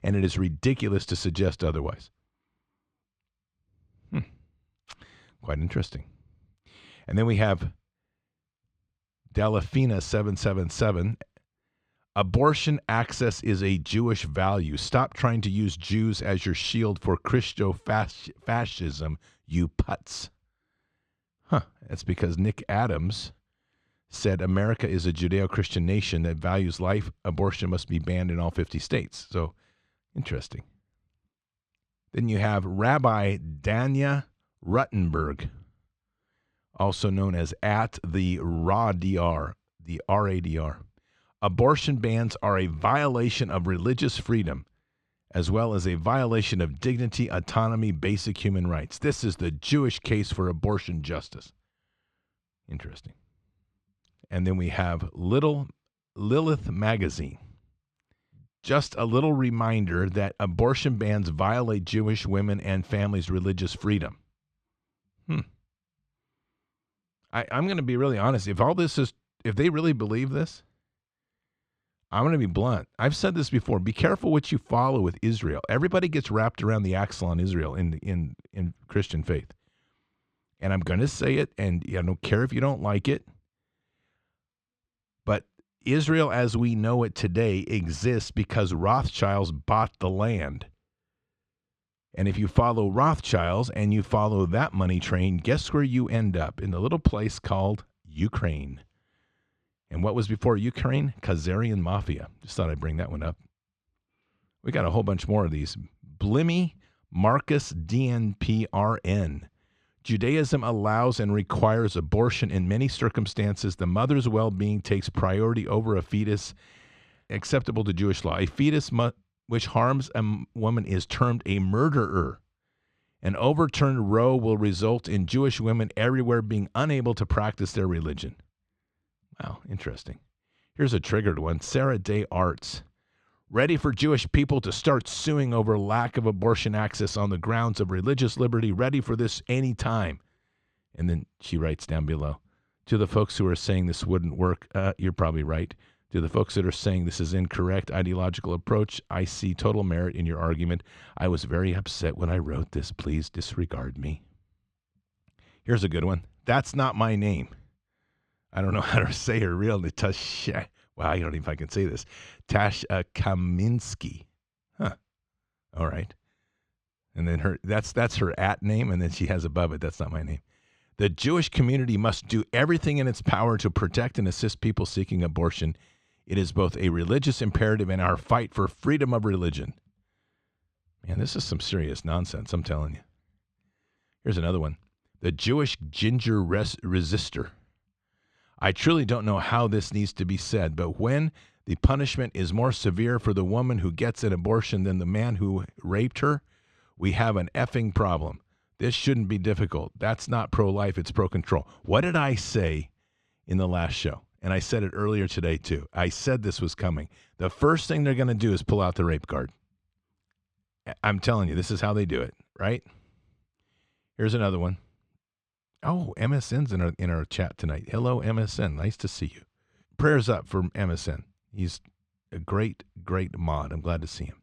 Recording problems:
muffled; slightly; fading above 3 kHz

